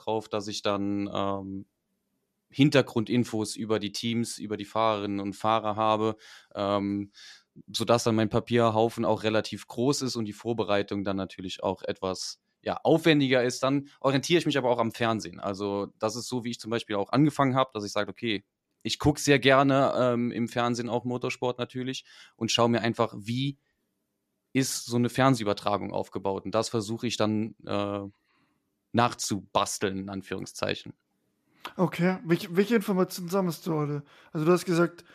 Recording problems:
none

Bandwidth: 14.5 kHz